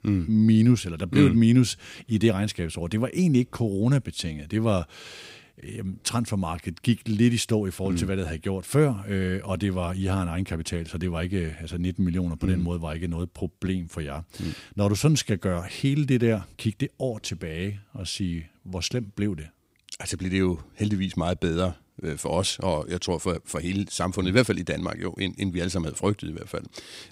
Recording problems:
none

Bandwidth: 15.5 kHz